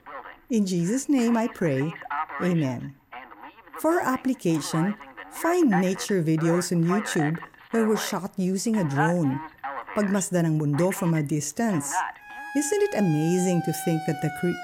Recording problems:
alarms or sirens; loud; throughout; 10 dB below the speech

